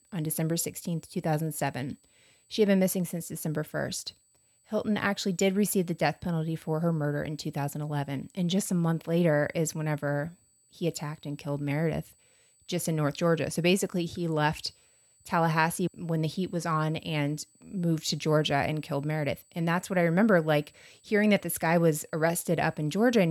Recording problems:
high-pitched whine; faint; throughout; 8 kHz, 35 dB below the speech
abrupt cut into speech; at the end

